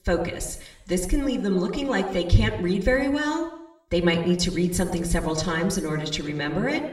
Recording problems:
room echo; slight; dies away in 0.8 s
off-mic speech; somewhat distant

